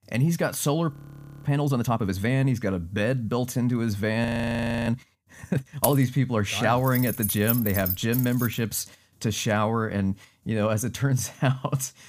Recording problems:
audio freezing; at 1 s for 0.5 s and at 4 s for 0.5 s
jangling keys; noticeable; at 6 s and from 7 to 8.5 s; peak 1 dB below the speech

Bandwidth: 15 kHz